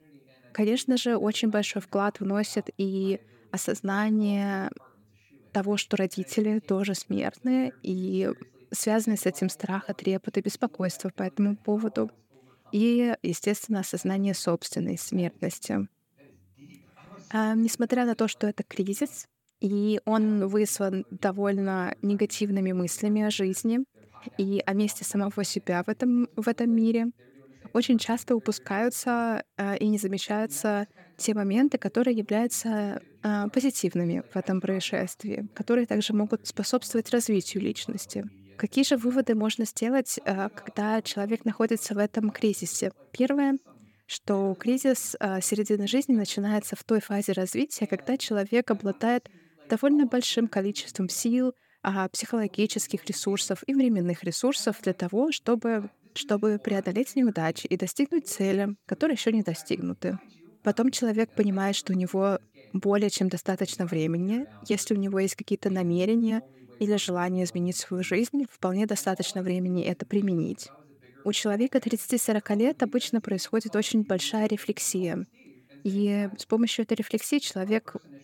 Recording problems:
voice in the background; faint; throughout; 30 dB below the speech

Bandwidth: 17.5 kHz